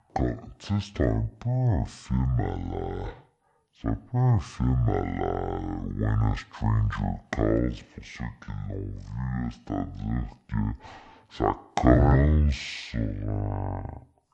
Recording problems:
wrong speed and pitch; too slow and too low; 0.5 times normal speed

